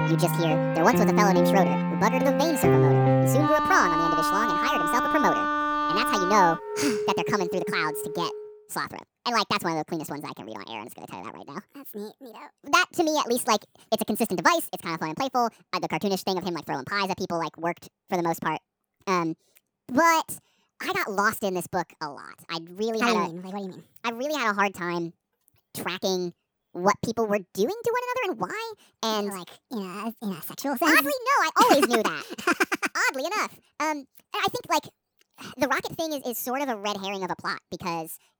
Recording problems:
wrong speed and pitch; too fast and too high; 1.7 times normal speed
background music; very loud; until 8.5 s; 1 dB above the speech

